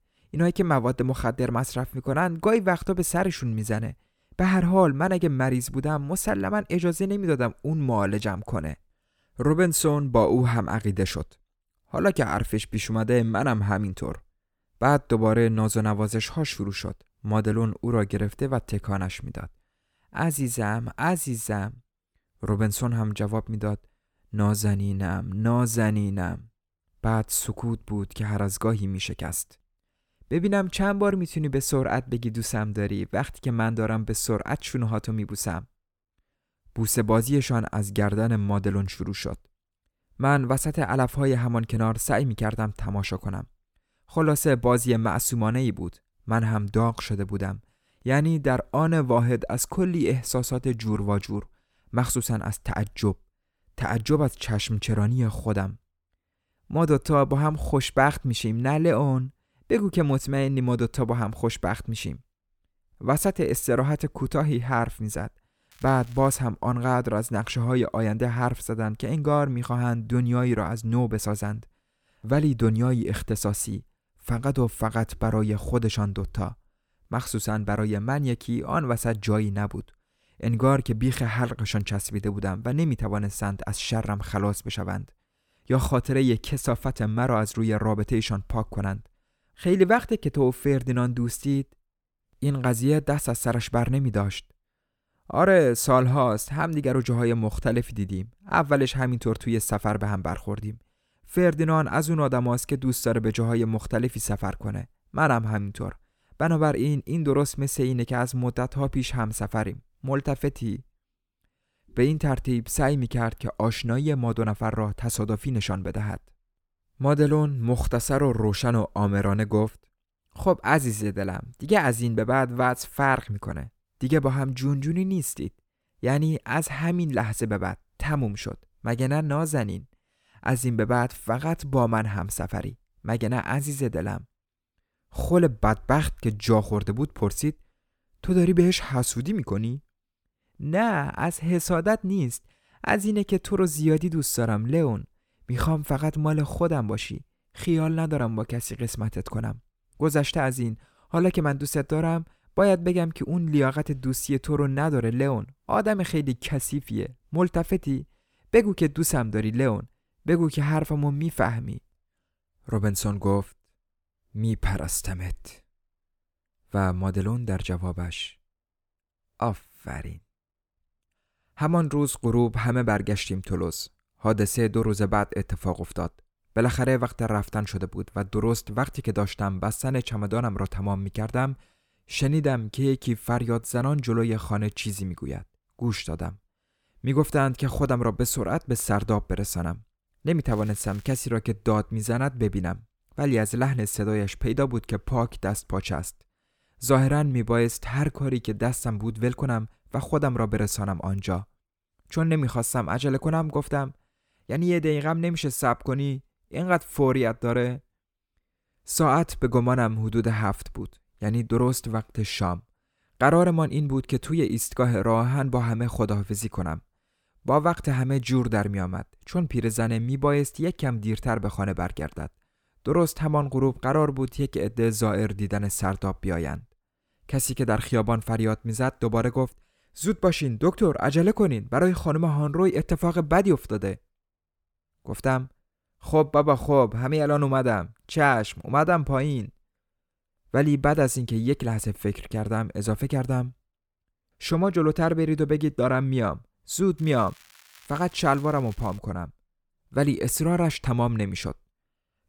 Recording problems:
crackling; faint; at 1:06, at 3:10 and from 4:07 to 4:09; 25 dB below the speech

